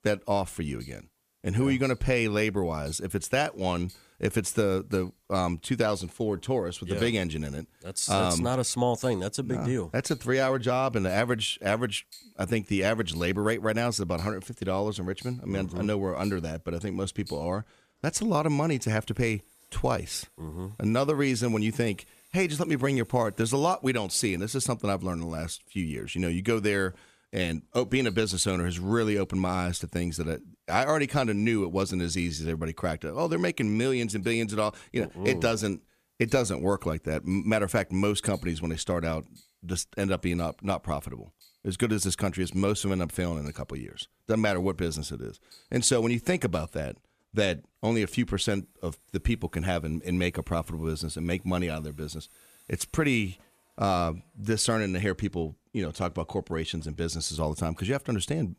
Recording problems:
household noises; faint; throughout; 25 dB below the speech

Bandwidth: 15 kHz